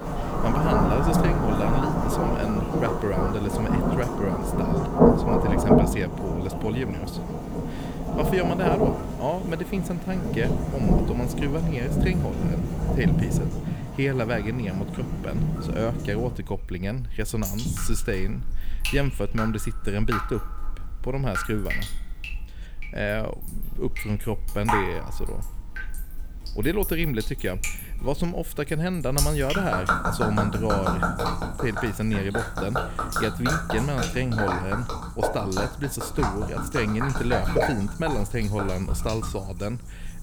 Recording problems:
rain or running water; very loud; throughout; 2 dB above the speech

